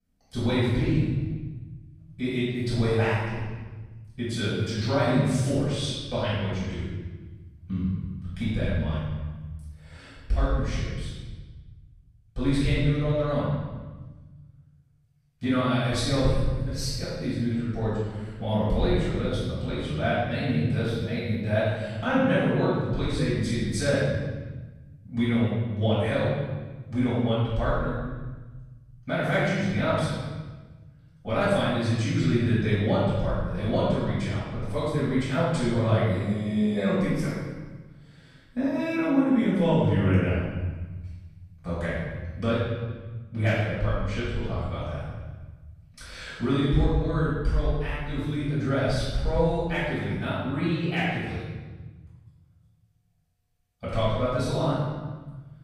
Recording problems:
room echo; strong; dies away in 1.4 s
off-mic speech; far

